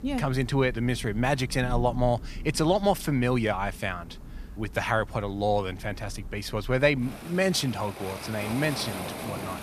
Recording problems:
rain or running water; noticeable; throughout; 15 dB below the speech

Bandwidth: 14.5 kHz